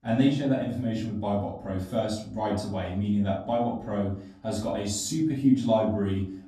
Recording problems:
off-mic speech; far
room echo; noticeable; dies away in 0.5 s

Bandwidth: 14 kHz